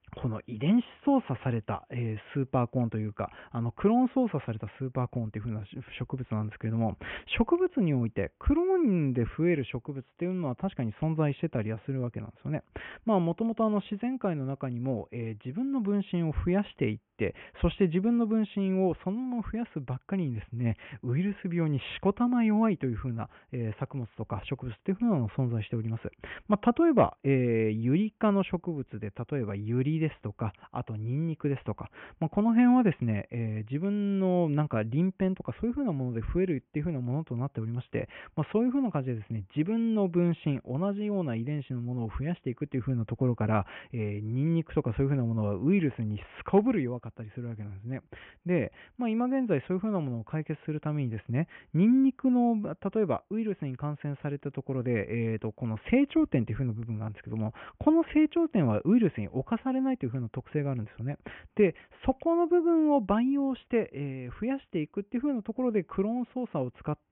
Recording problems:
high frequencies cut off; severe; nothing above 3.5 kHz

